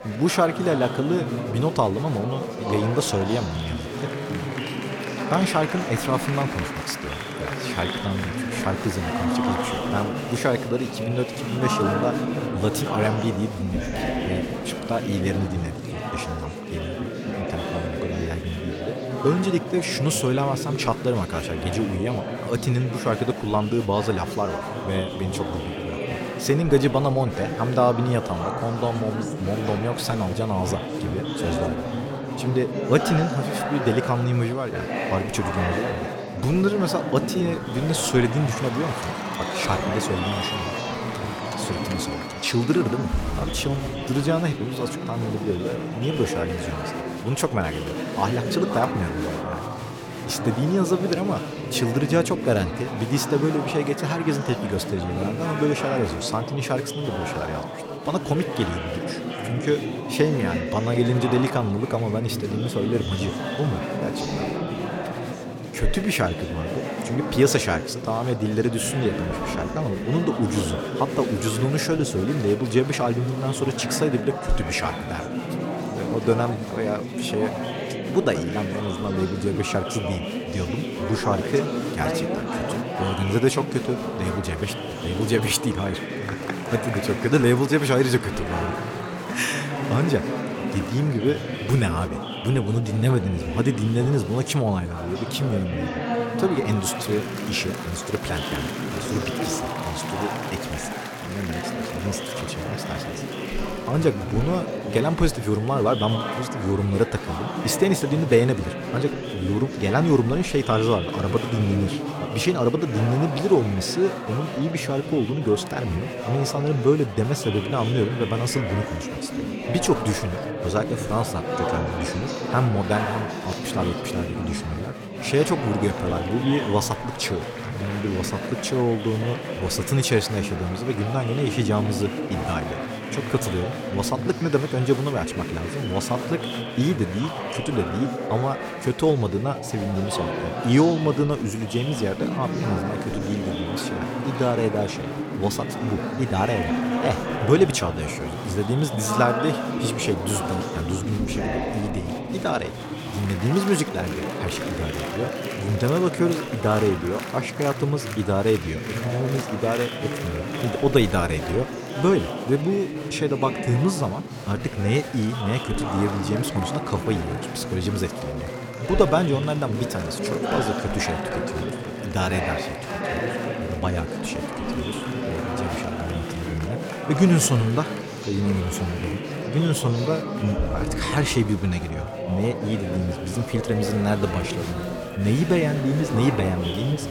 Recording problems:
chatter from many people; loud; throughout; 4 dB below the speech

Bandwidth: 17 kHz